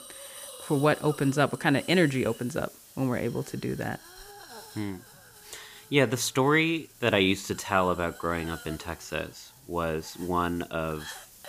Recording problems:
hiss; noticeable; throughout; 20 dB below the speech

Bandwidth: 15 kHz